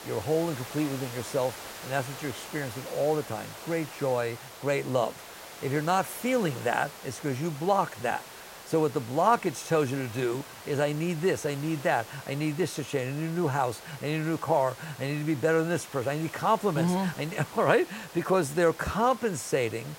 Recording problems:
hiss; noticeable; throughout; 15 dB below the speech

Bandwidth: 16 kHz